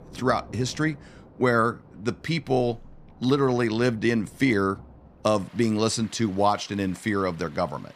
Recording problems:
rain or running water; faint; throughout; 25 dB below the speech

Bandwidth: 15 kHz